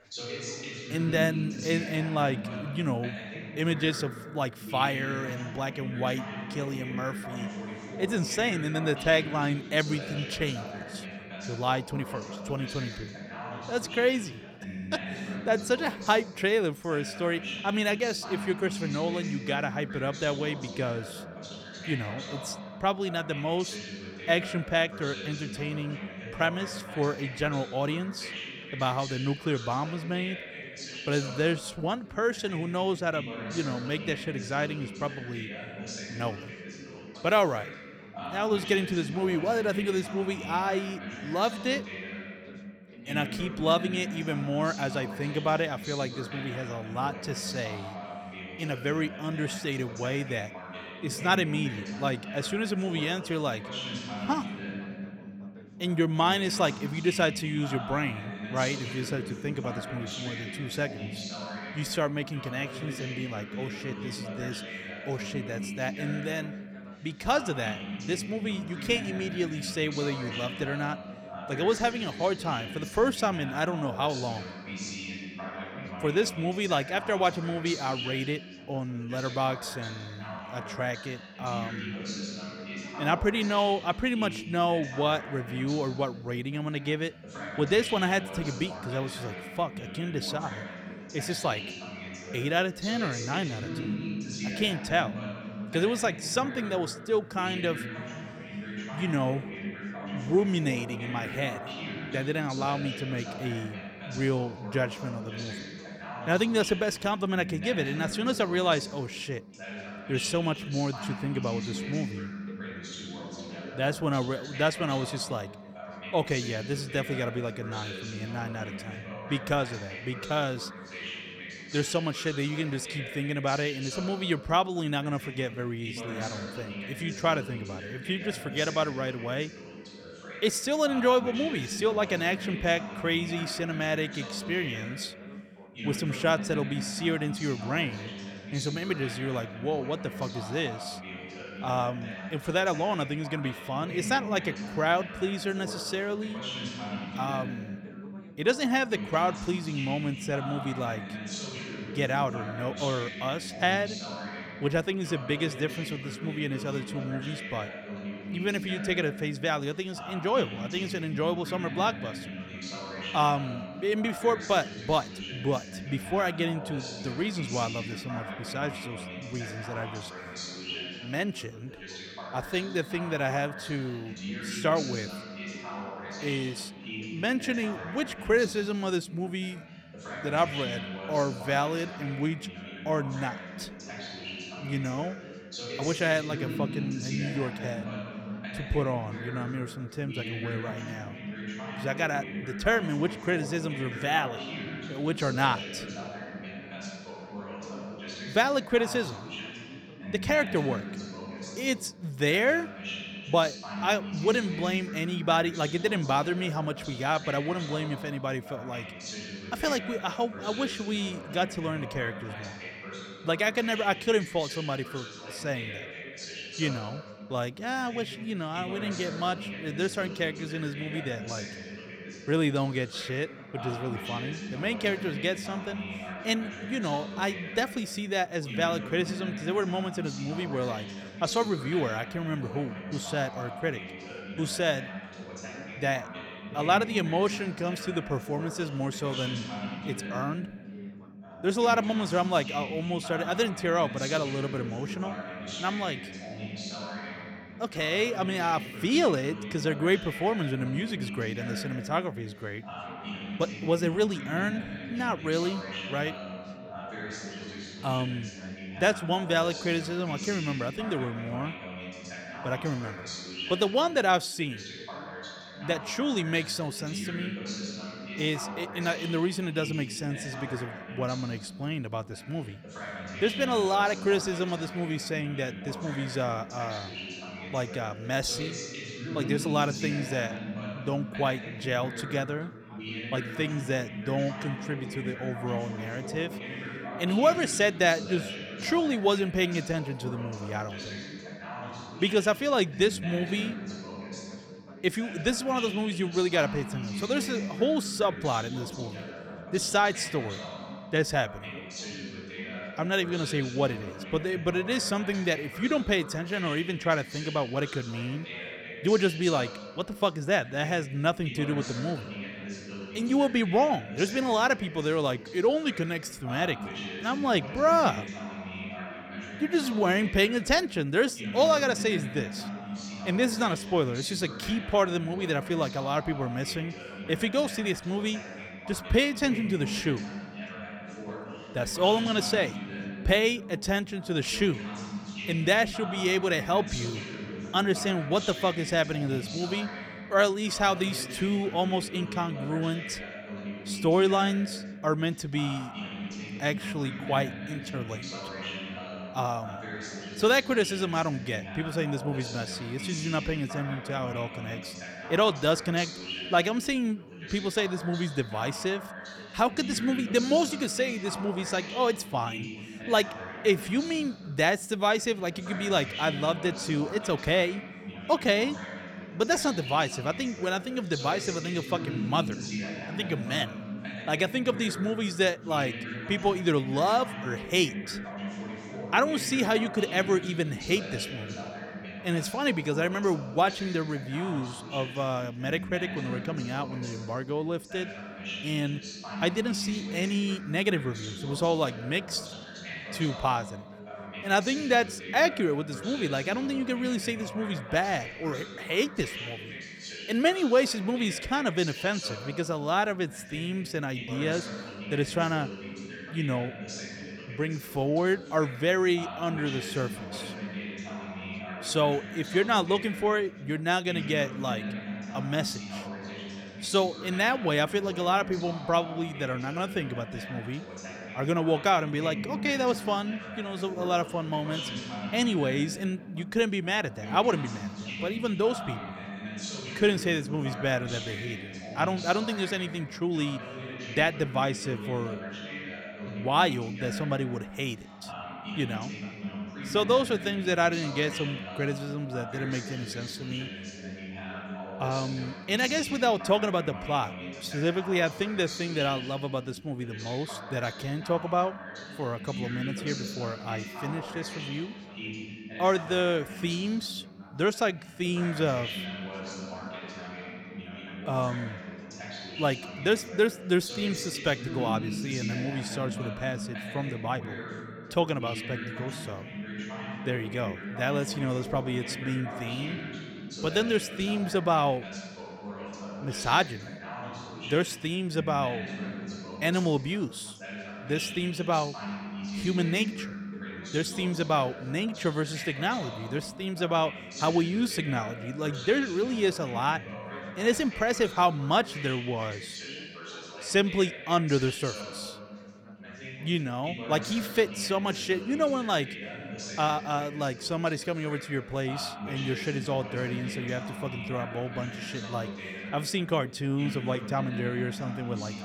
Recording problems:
background chatter; loud; throughout; 2 voices, 9 dB below the speech

